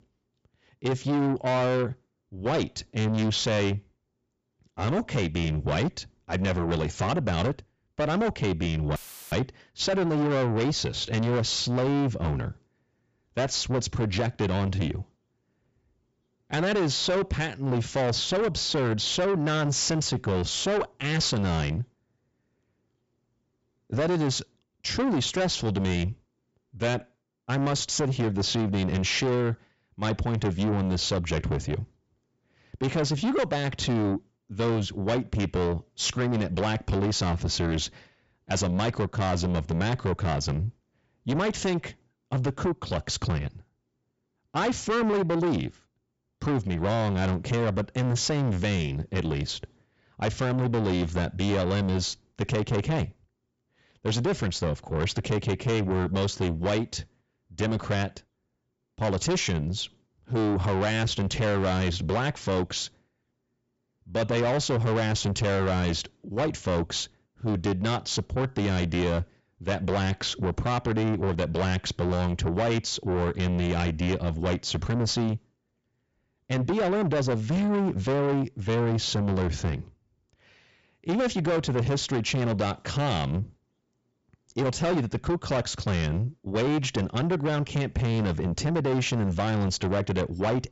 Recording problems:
distortion; heavy; 7 dB below the speech
high frequencies cut off; noticeable; nothing above 8 kHz
audio cutting out; filled with static; at 9 s

